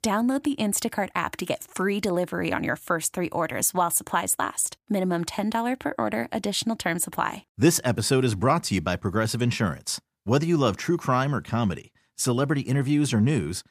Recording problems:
none

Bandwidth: 15 kHz